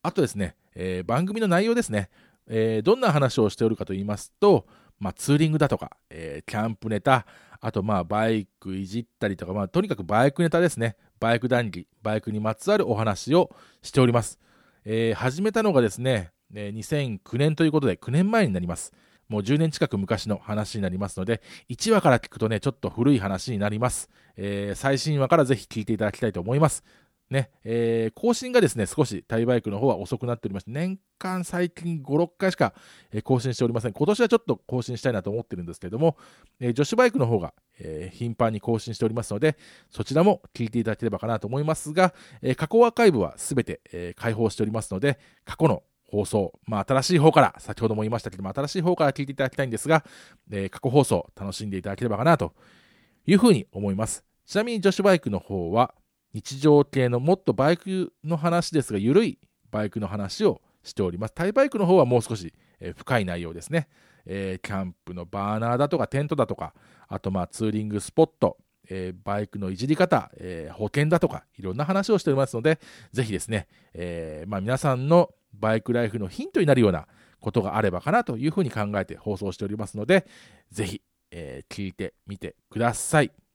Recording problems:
none

